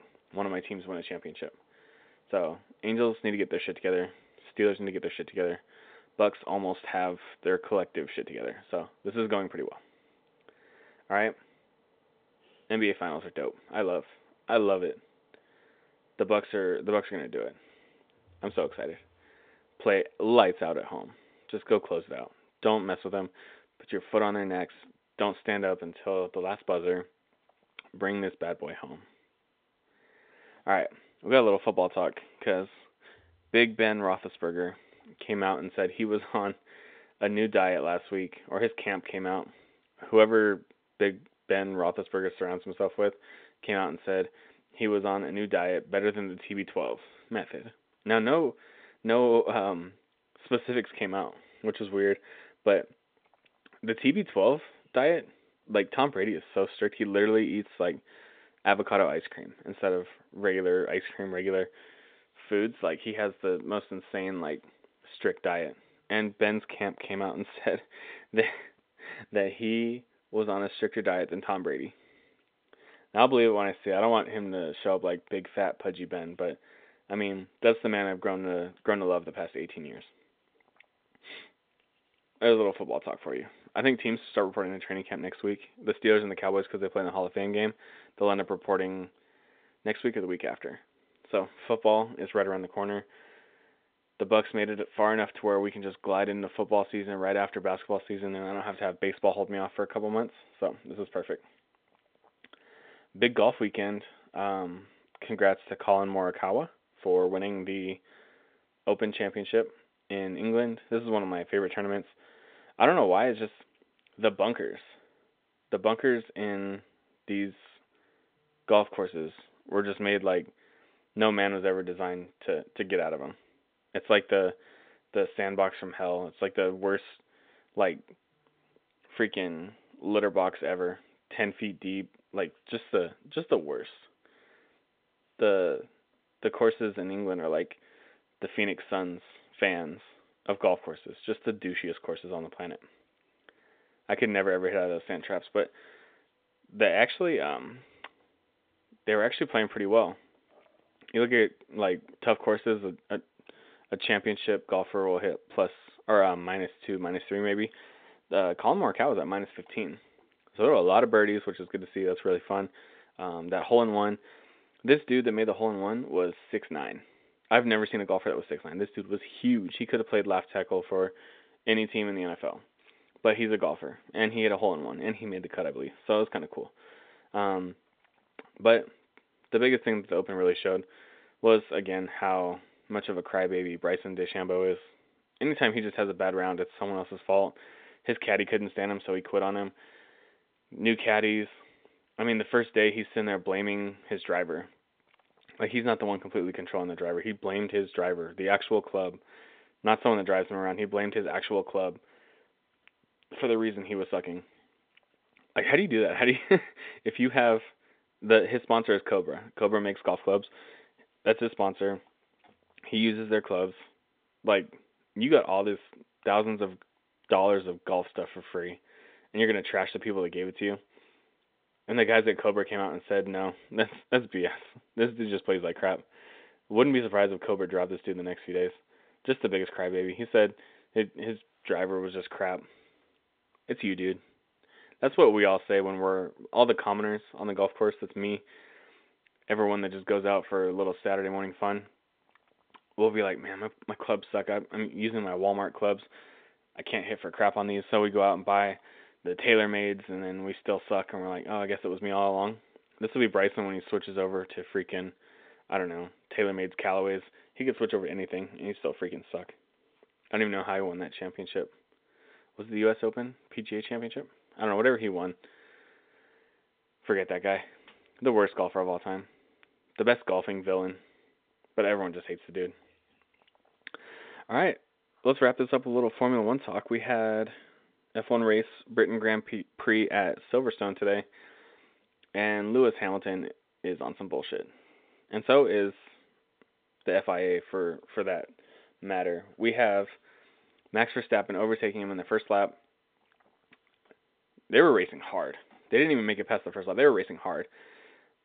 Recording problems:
phone-call audio; nothing above 3.5 kHz

